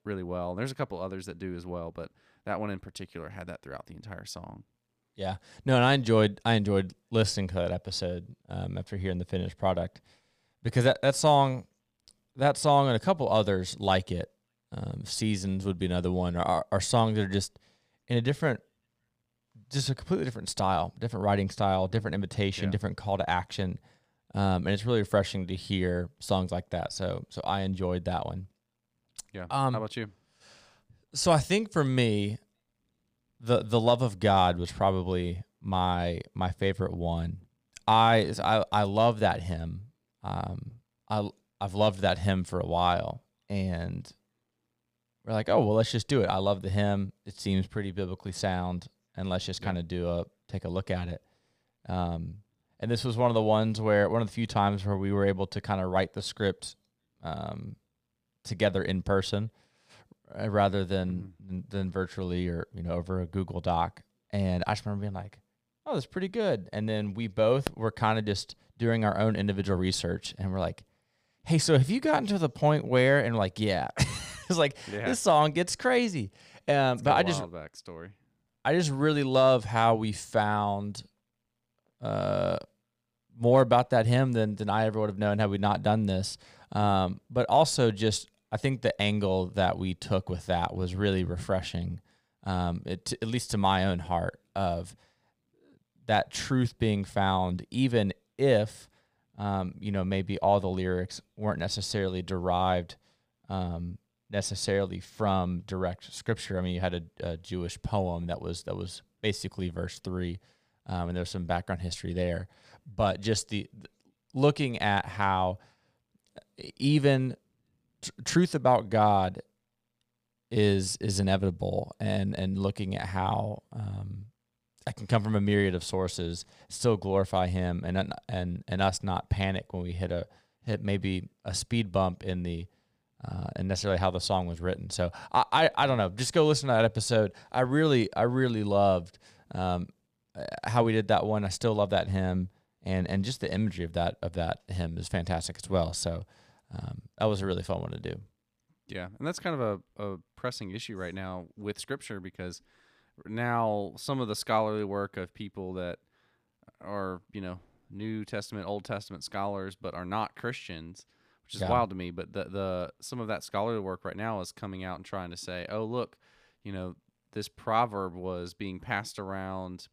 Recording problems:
none

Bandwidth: 15 kHz